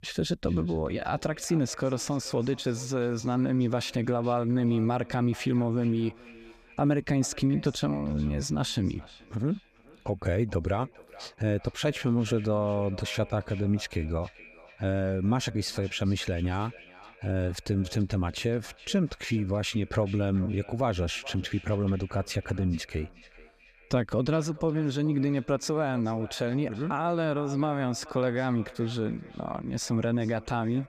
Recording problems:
echo of what is said; faint; throughout; 430 ms later, 20 dB below the speech

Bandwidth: 15 kHz